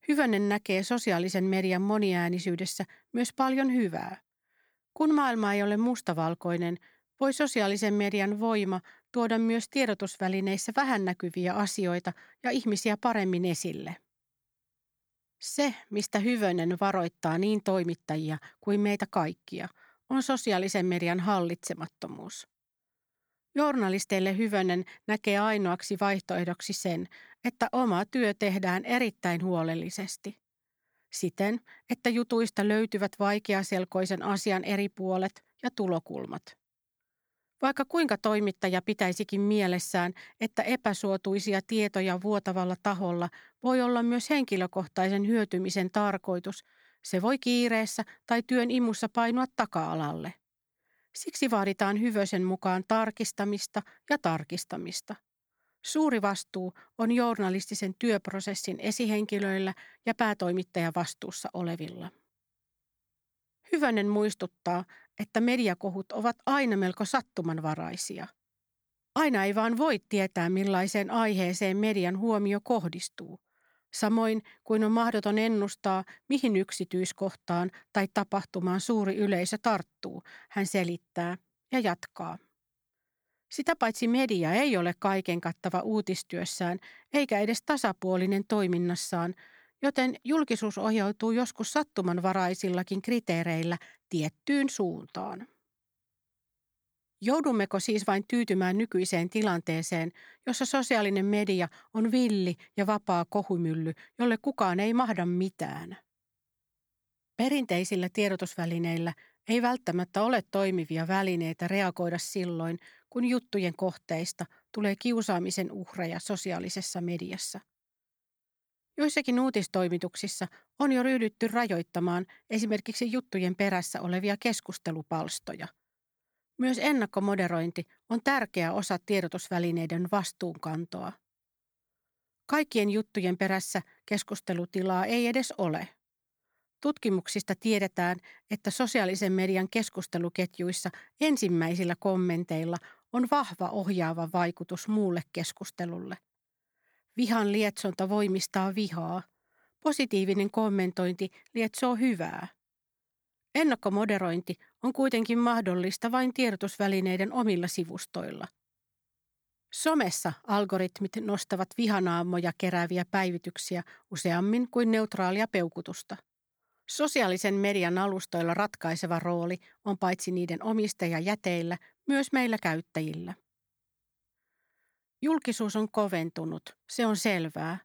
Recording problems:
none

